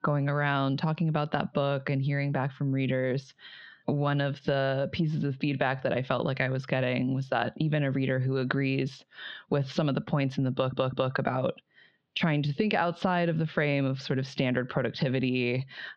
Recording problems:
squashed, flat; heavily
muffled; very slightly; fading above 3 kHz
audio stuttering; at 11 s

